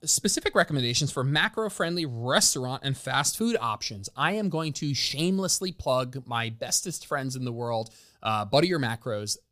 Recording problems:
none

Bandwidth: 15 kHz